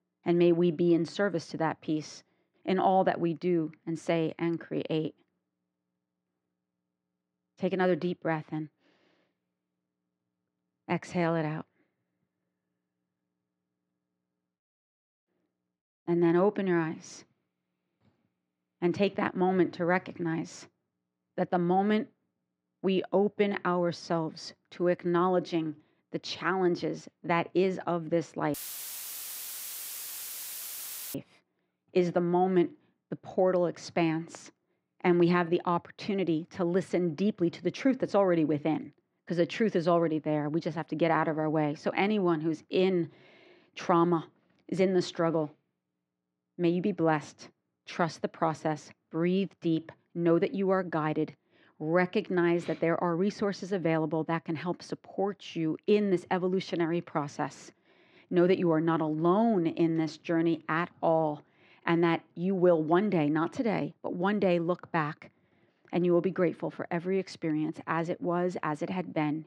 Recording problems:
muffled; very; fading above 2.5 kHz
audio cutting out; filled with static; at 29 s for 2.5 s

